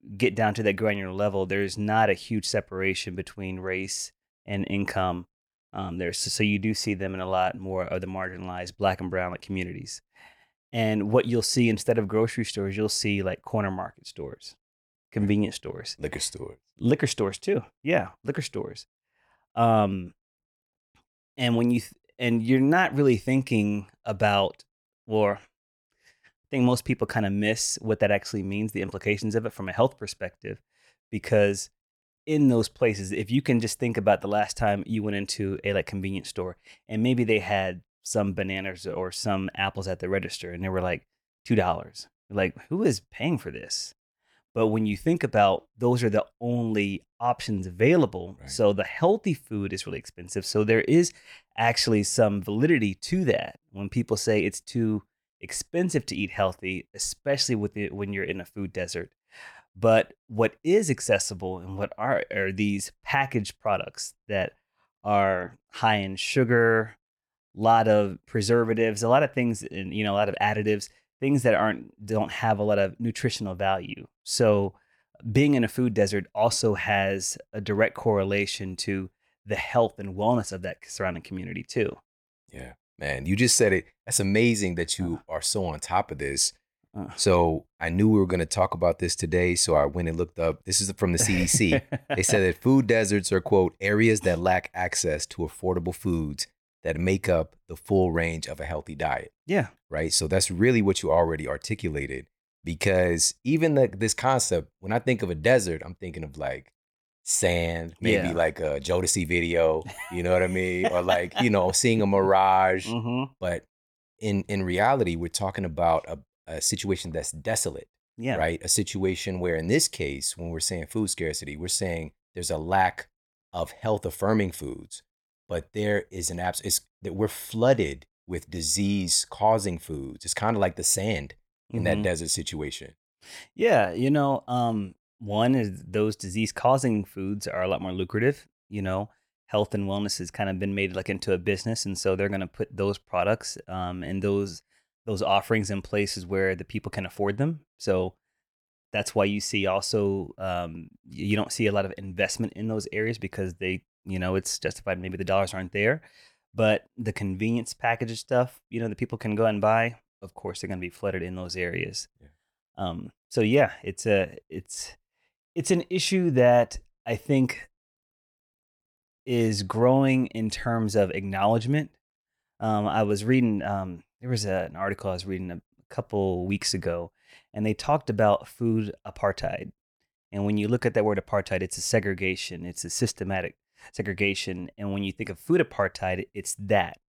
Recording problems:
none

